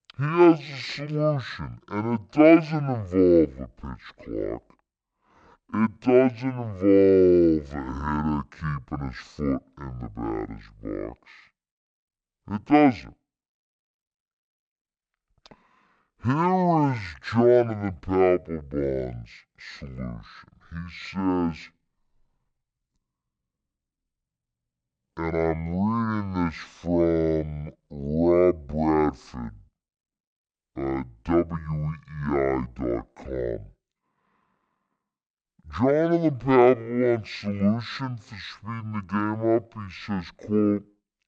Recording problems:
wrong speed and pitch; too slow and too low; 0.5 times normal speed

